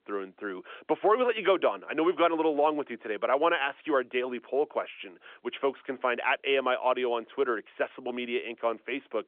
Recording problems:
phone-call audio; nothing above 3.5 kHz

